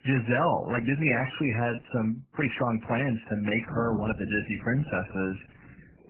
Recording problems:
garbled, watery; badly; nothing above 3 kHz
rain or running water; noticeable; from 3.5 s on; 15 dB below the speech
uneven, jittery; strongly; from 0.5 to 5.5 s

